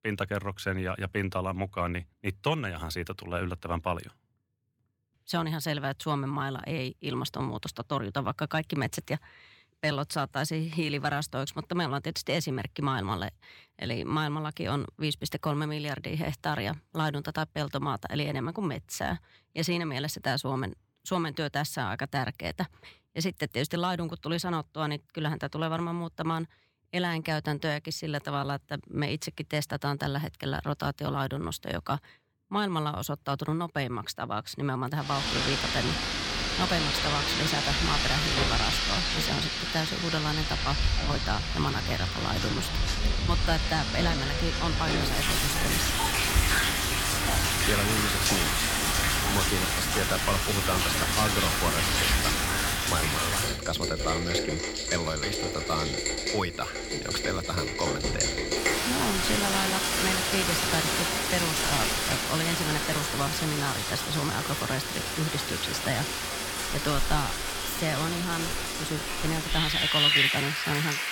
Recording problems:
rain or running water; very loud; from 35 s on; 5 dB above the speech

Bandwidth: 17 kHz